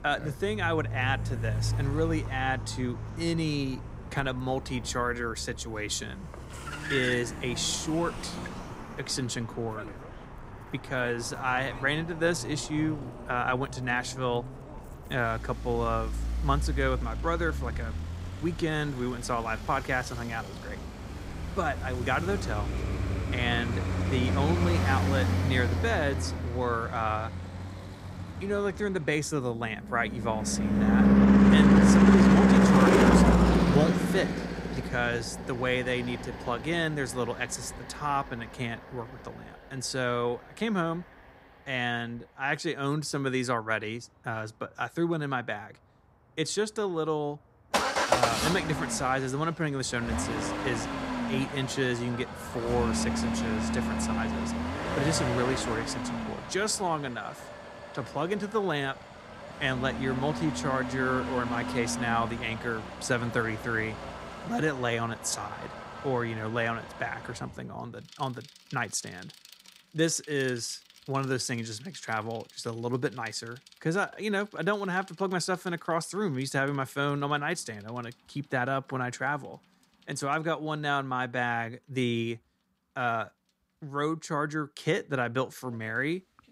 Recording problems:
traffic noise; very loud; throughout; 2 dB above the speech

